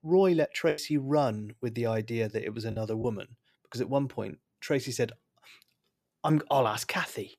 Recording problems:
choppy; occasionally; at 0.5 s and at 2.5 s; 5% of the speech affected

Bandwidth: 14.5 kHz